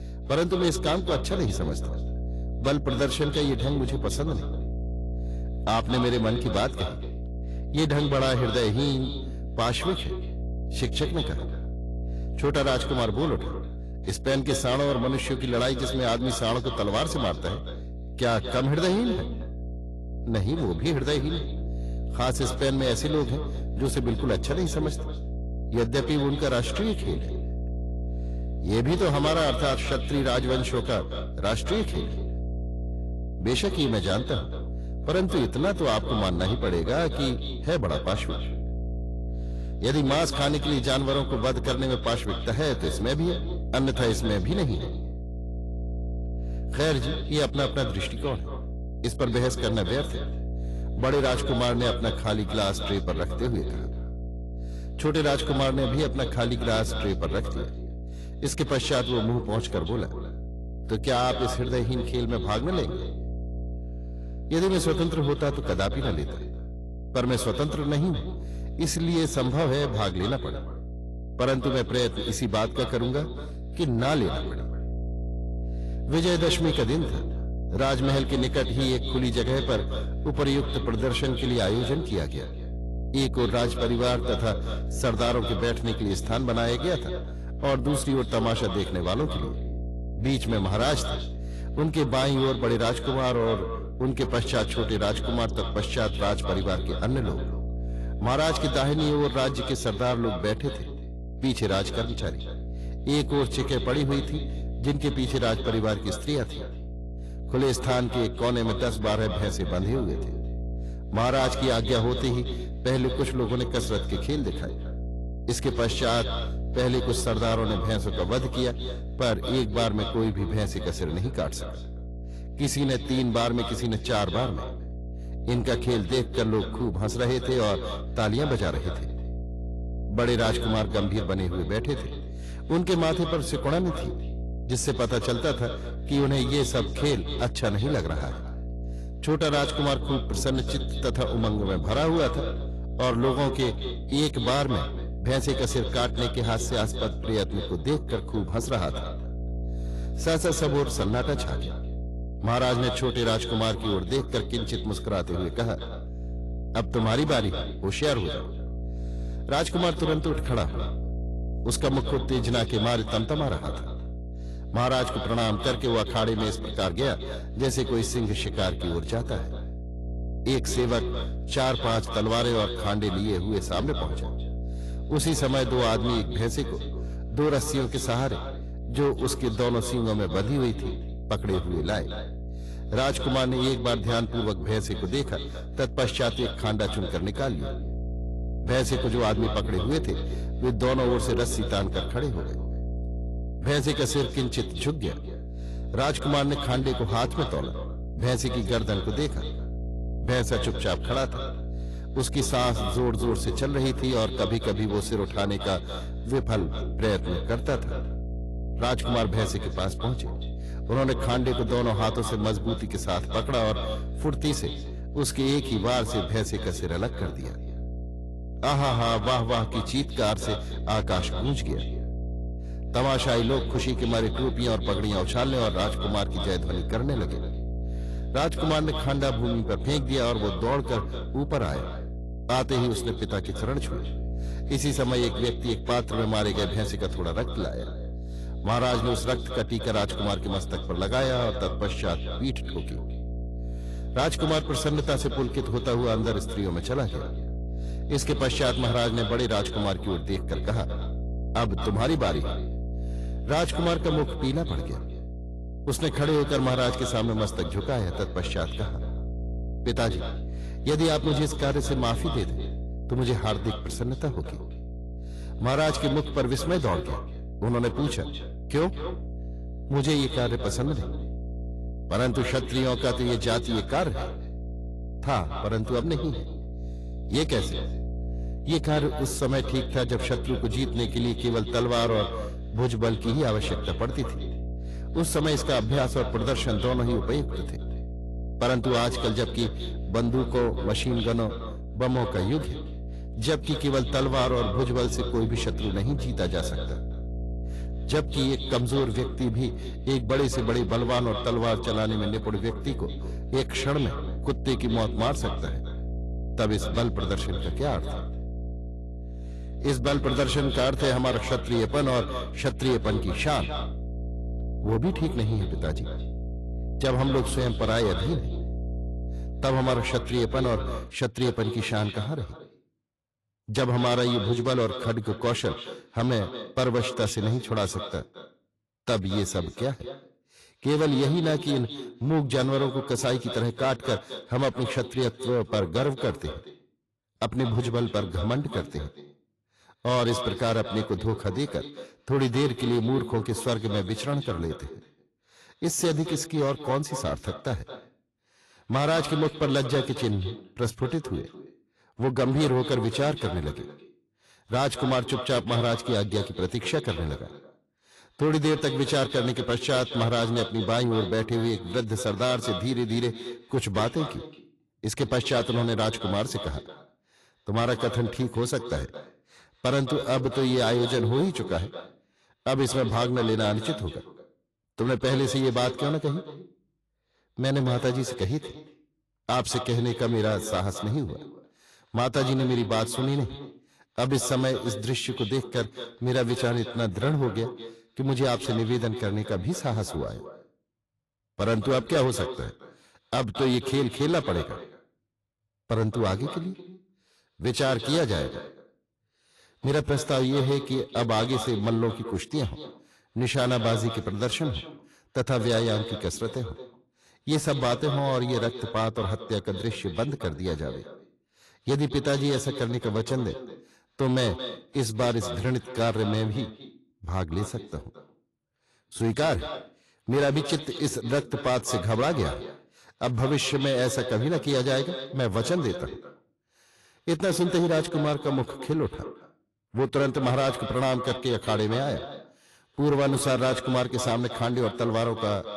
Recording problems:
echo of what is said; strong; throughout; 220 ms later, 10 dB below the speech
distortion; slight; 10 dB below the speech
garbled, watery; slightly; nothing above 11.5 kHz
electrical hum; noticeable; until 5:21; 60 Hz, 15 dB below the speech

